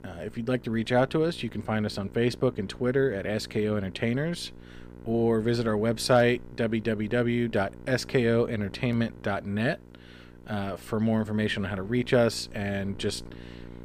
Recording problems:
electrical hum; faint; throughout; 60 Hz, 25 dB below the speech

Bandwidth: 15 kHz